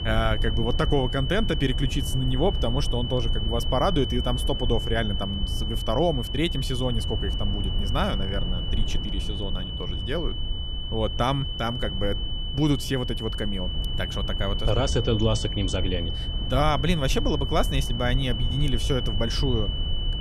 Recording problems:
high-pitched whine; loud; throughout; 3 kHz, 5 dB below the speech
low rumble; noticeable; throughout; 15 dB below the speech

